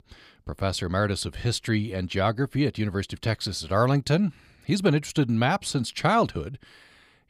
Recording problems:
none

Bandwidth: 15 kHz